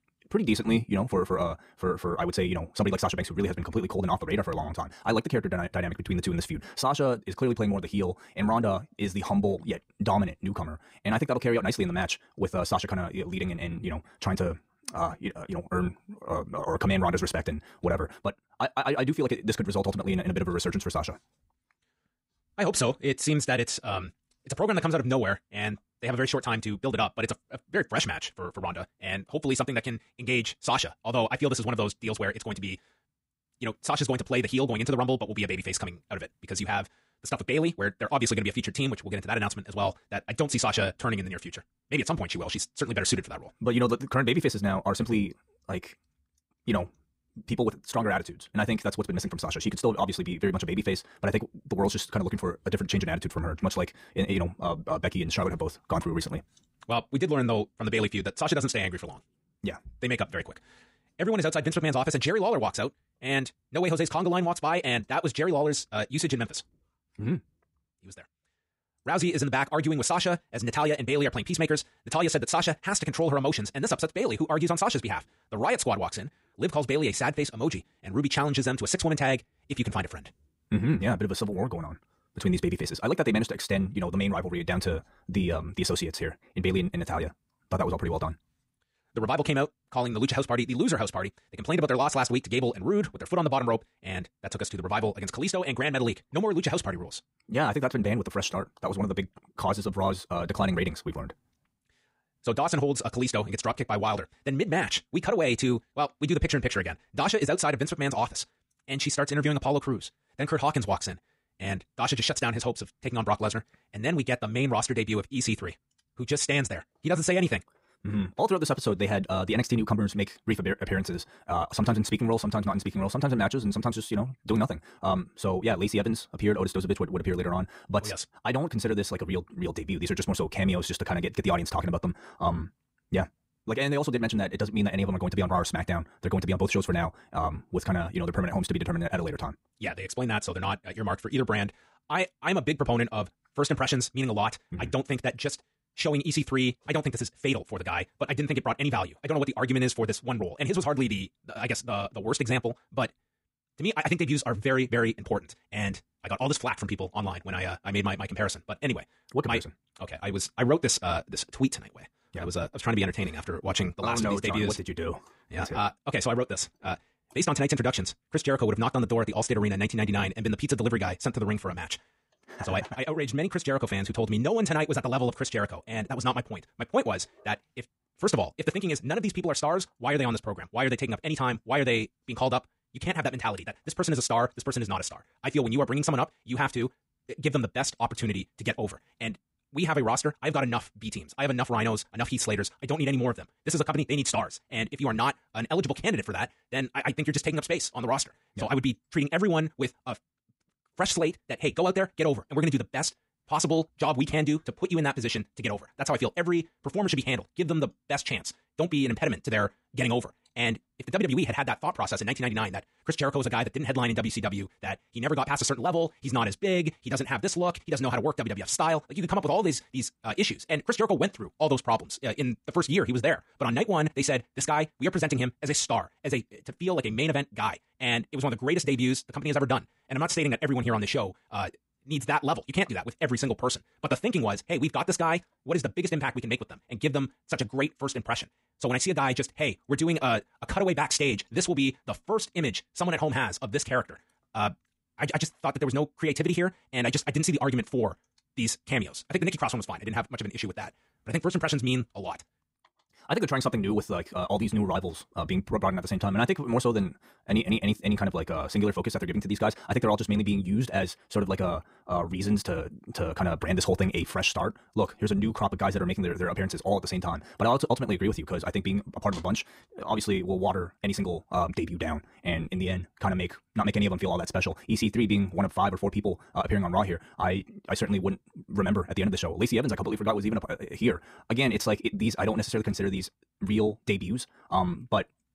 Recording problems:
wrong speed, natural pitch; too fast; 1.8 times normal speed

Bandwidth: 15.5 kHz